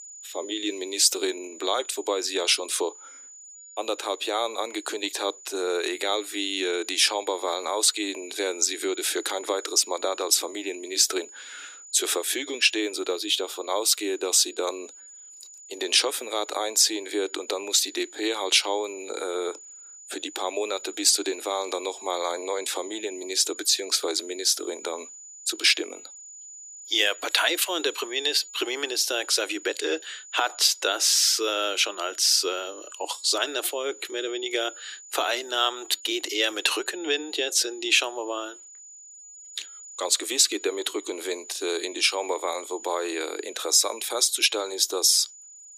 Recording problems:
thin; very; fading below 300 Hz
high-pitched whine; noticeable; throughout; 7 kHz, 20 dB below the speech

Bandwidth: 15 kHz